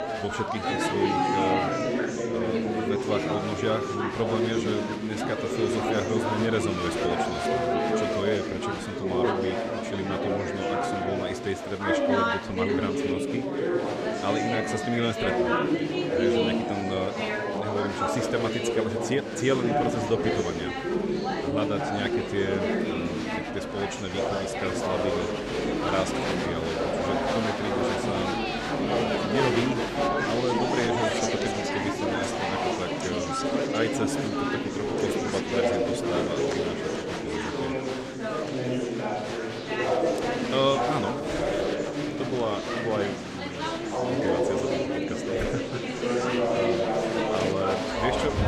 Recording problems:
chatter from many people; very loud; throughout; 4 dB above the speech

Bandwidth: 14.5 kHz